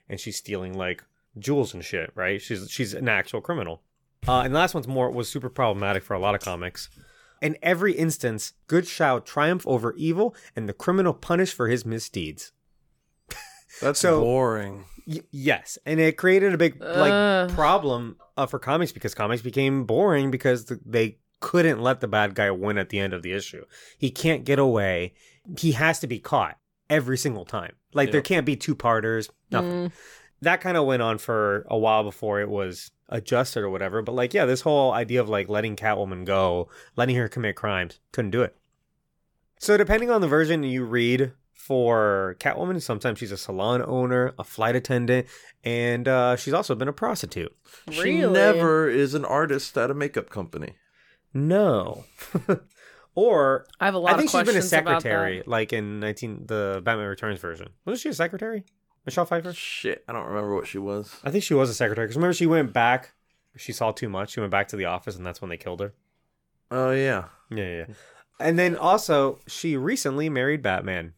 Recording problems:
none

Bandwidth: 18.5 kHz